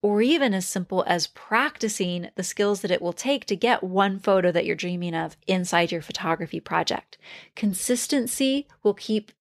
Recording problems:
none

